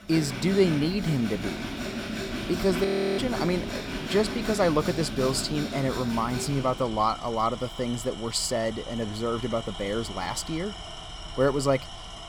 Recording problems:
machinery noise; loud; throughout; 7 dB below the speech
audio freezing; at 3 s

